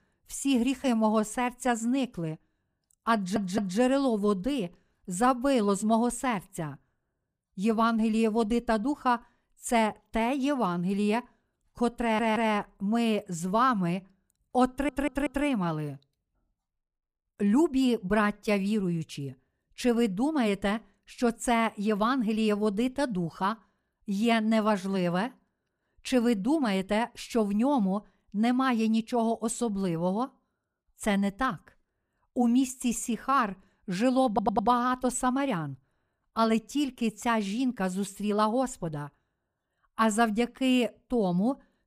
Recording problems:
audio stuttering; 4 times, first at 3 s

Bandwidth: 15 kHz